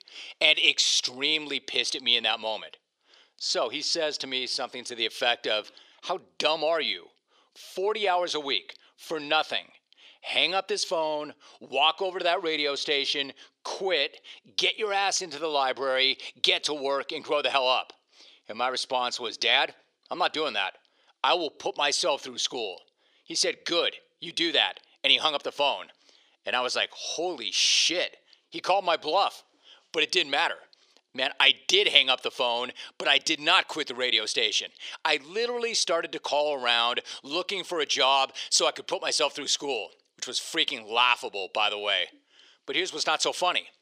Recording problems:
thin; very; fading below 350 Hz

